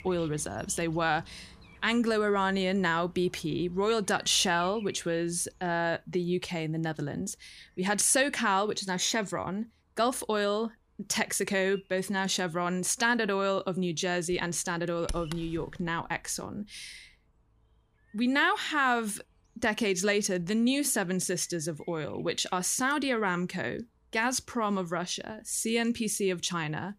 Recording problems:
animal sounds; faint; throughout; 25 dB below the speech

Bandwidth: 15 kHz